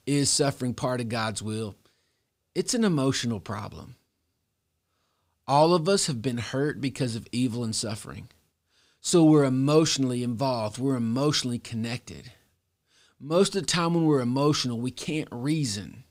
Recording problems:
none

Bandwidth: 15.5 kHz